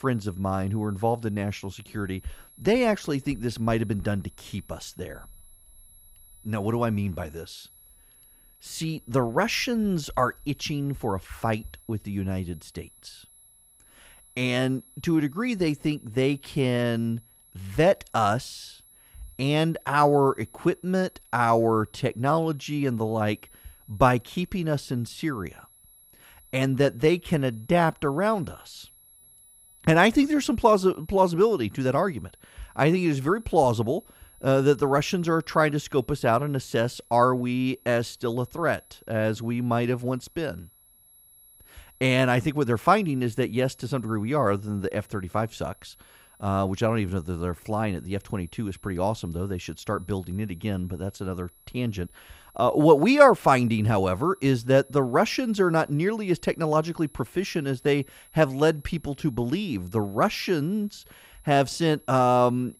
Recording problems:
high-pitched whine; faint; throughout; 11 kHz, 30 dB below the speech

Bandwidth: 15 kHz